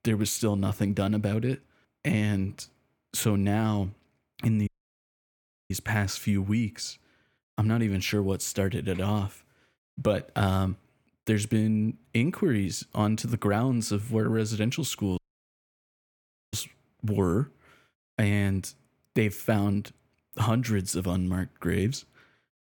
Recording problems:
audio cutting out; at 4.5 s for 1 s and at 15 s for 1.5 s

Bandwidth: 18.5 kHz